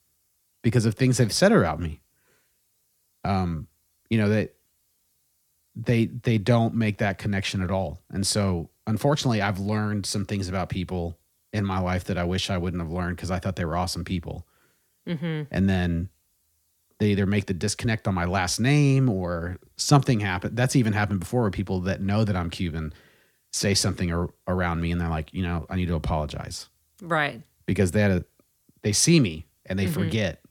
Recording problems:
none

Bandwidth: 18.5 kHz